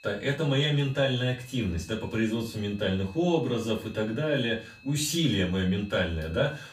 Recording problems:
off-mic speech; far
room echo; slight; dies away in 0.3 s
high-pitched whine; faint; throughout; 2.5 kHz, 25 dB below the speech

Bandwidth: 15.5 kHz